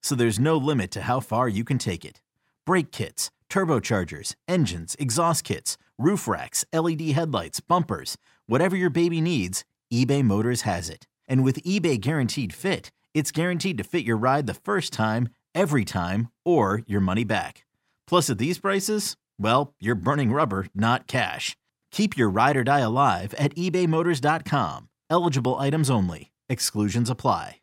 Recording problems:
none

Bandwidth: 16 kHz